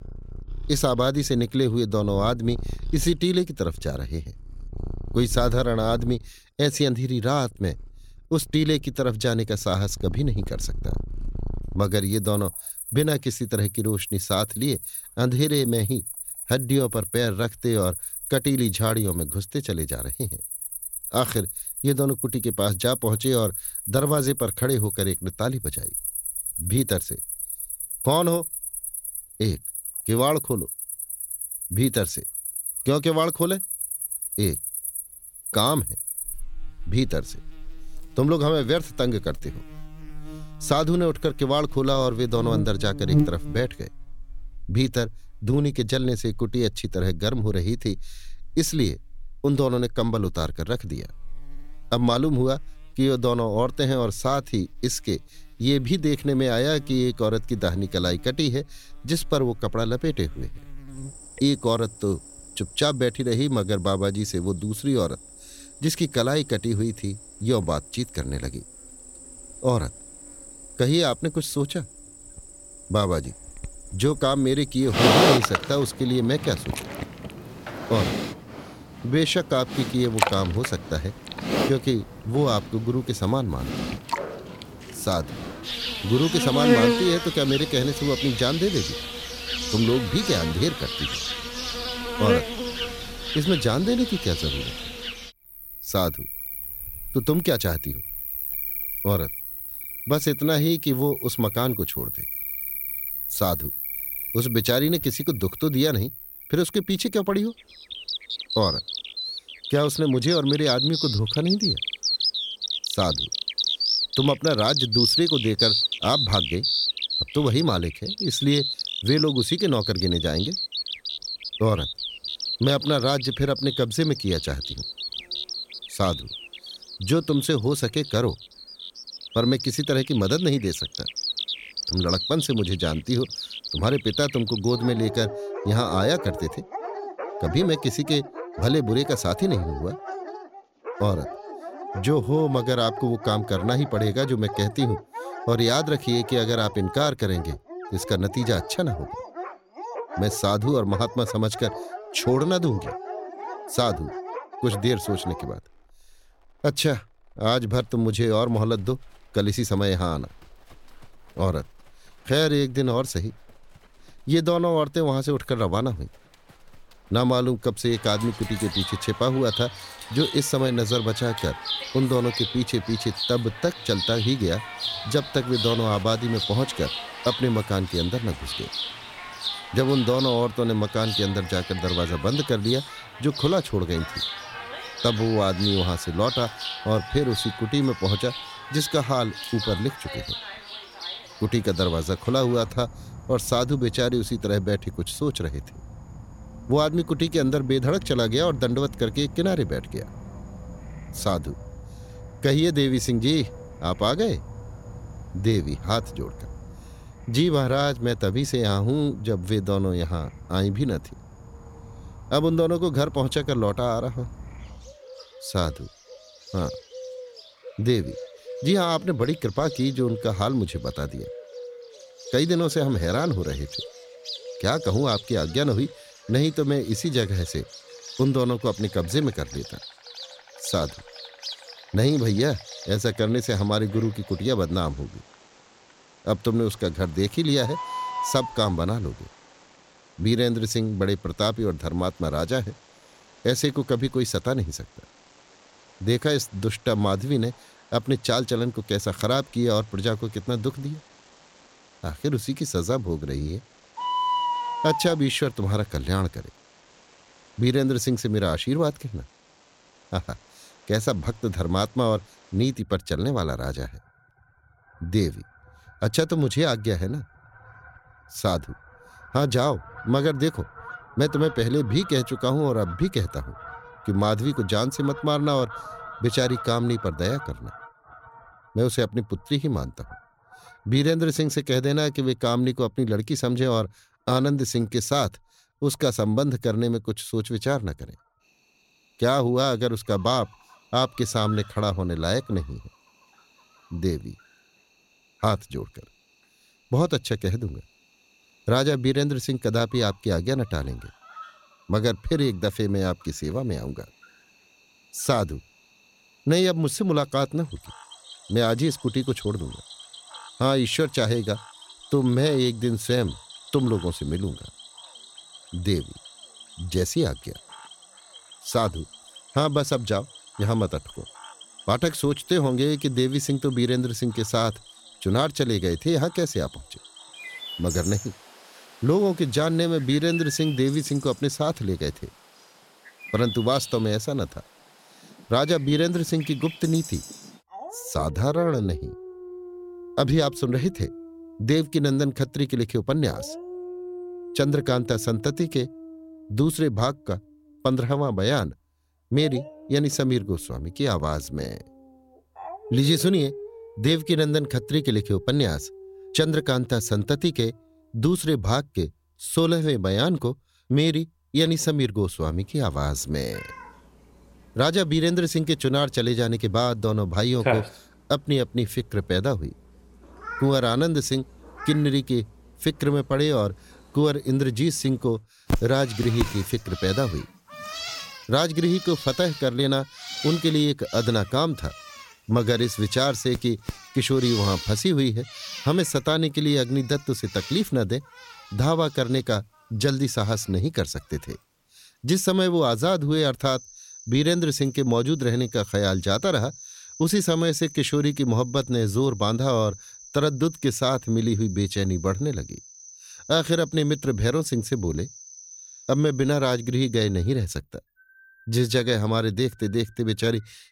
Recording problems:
animal sounds; loud; throughout; 7 dB below the speech

